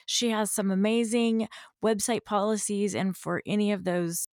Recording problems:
none

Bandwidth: 17 kHz